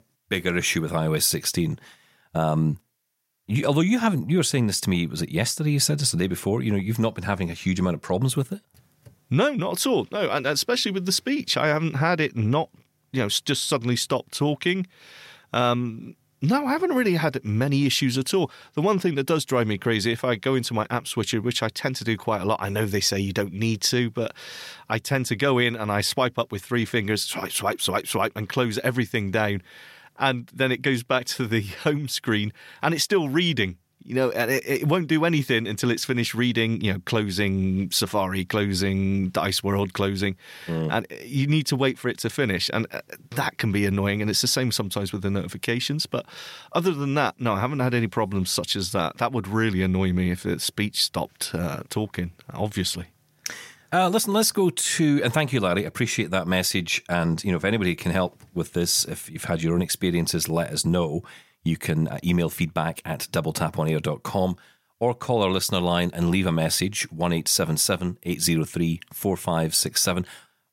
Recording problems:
none

